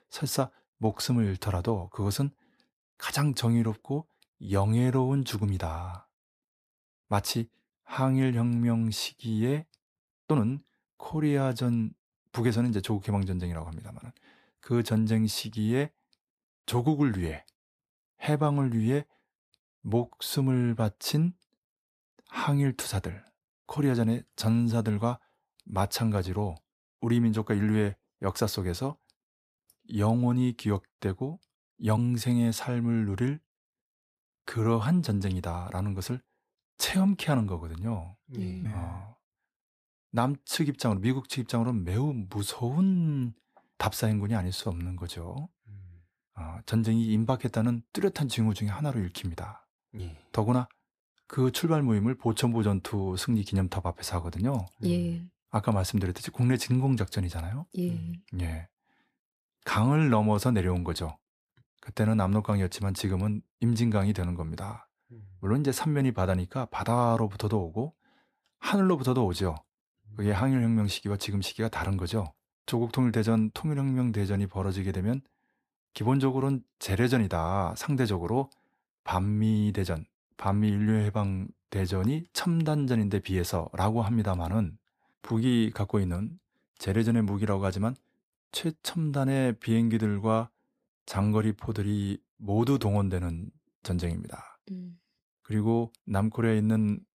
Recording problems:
uneven, jittery; slightly; from 10 s to 1:26

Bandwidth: 14.5 kHz